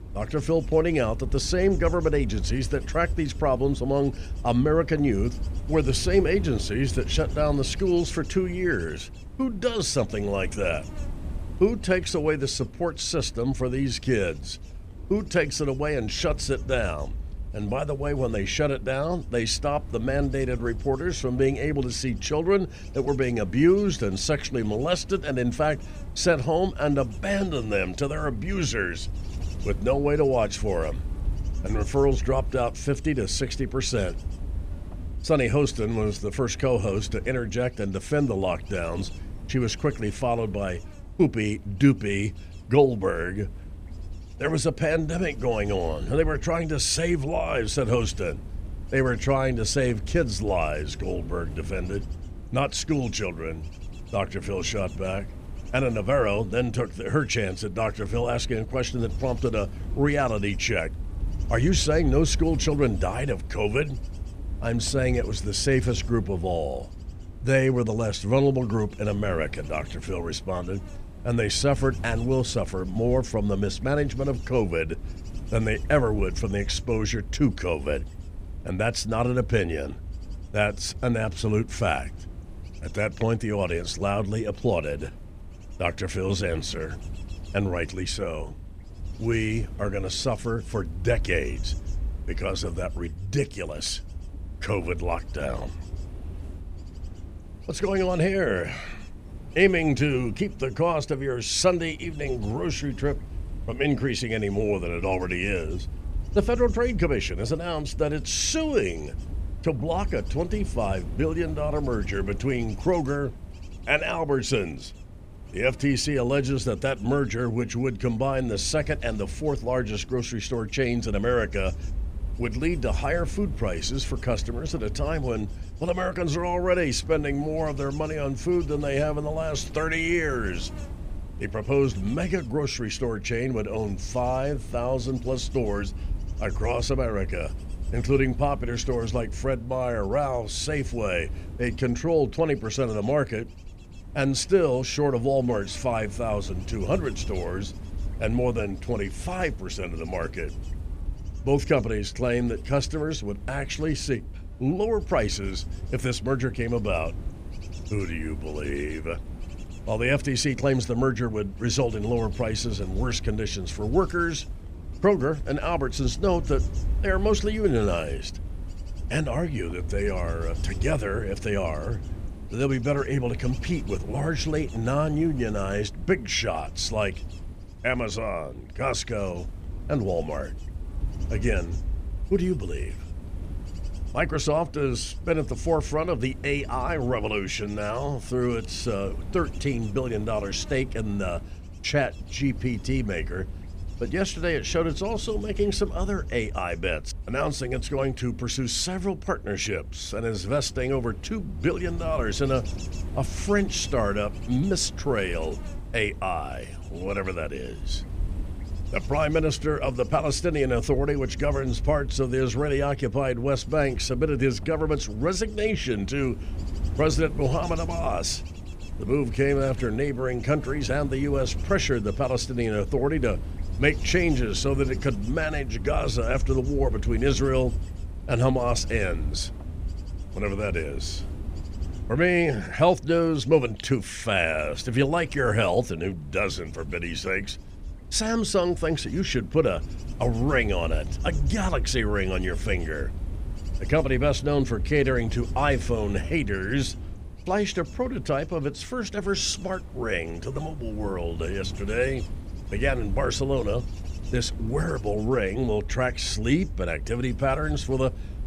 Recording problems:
wind noise on the microphone; occasional gusts; 20 dB below the speech

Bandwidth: 15 kHz